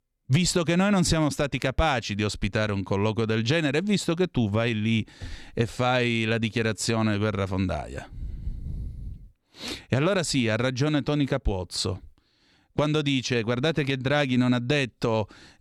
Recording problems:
none

